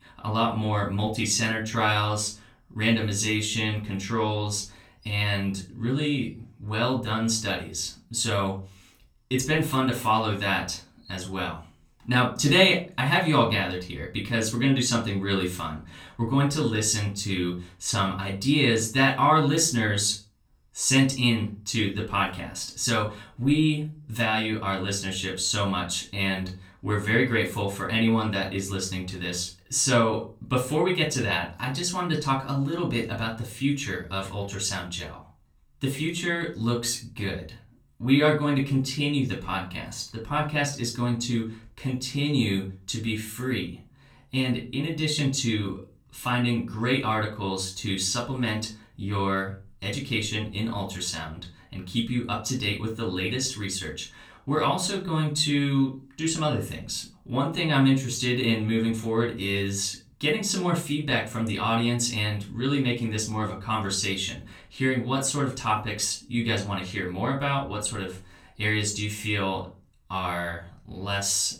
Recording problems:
off-mic speech; far
room echo; slight; dies away in 0.3 s

